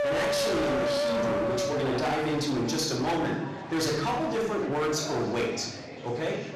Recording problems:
distortion; heavy; 30% of the sound clipped
off-mic speech; far
room echo; noticeable; dies away in 0.8 s
murmuring crowd; noticeable; throughout; 10 dB below the speech
background music; very faint; until 1.5 s; 1 dB above the speech

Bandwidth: 14 kHz